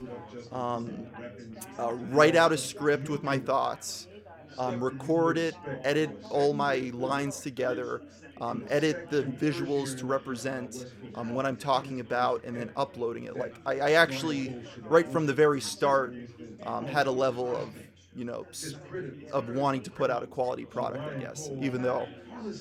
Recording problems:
background chatter; noticeable; throughout; 4 voices, 15 dB below the speech

